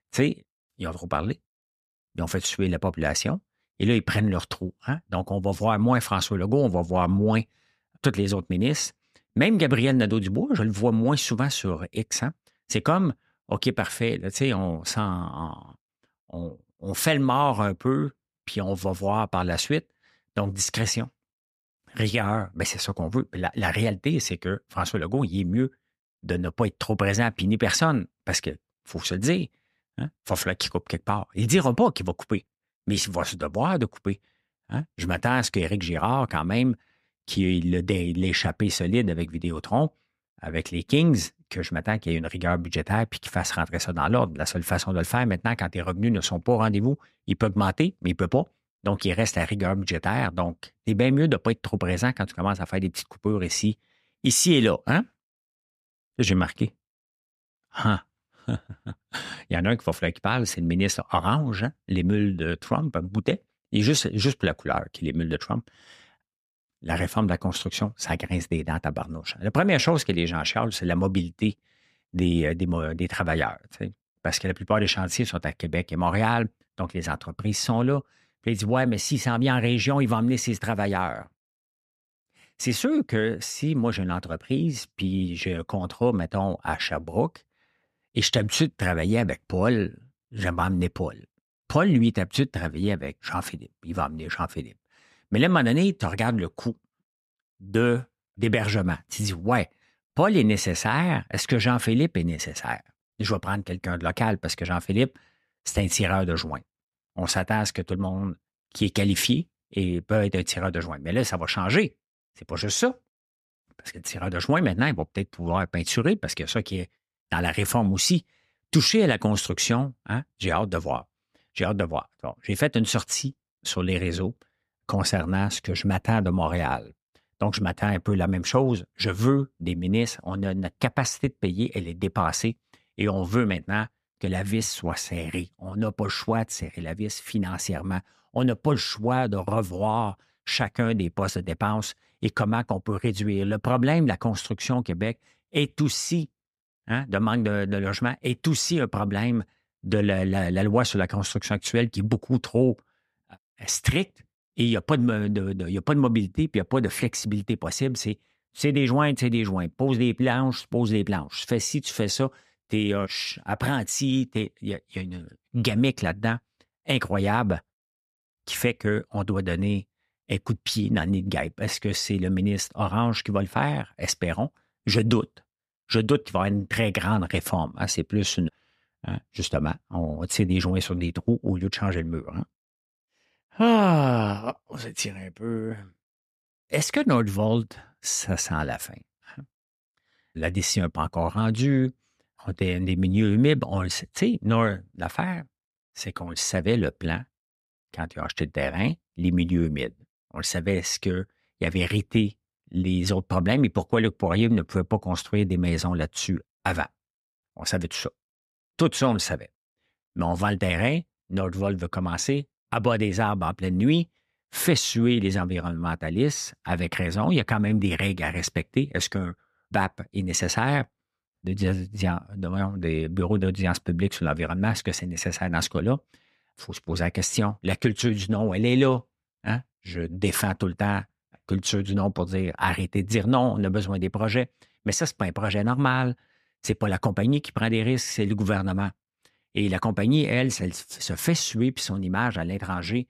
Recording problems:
none

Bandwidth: 14.5 kHz